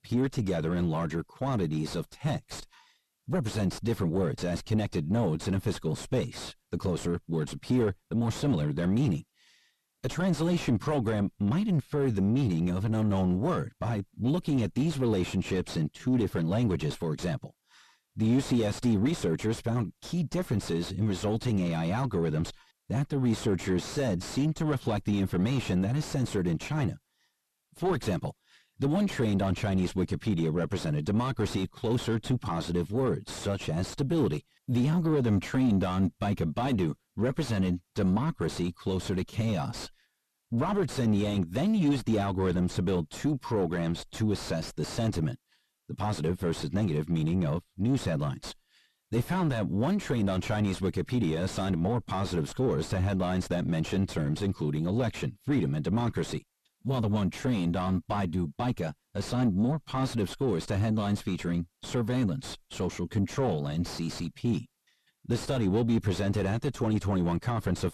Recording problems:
distortion; heavy; 4 dB below the speech

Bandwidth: 13.5 kHz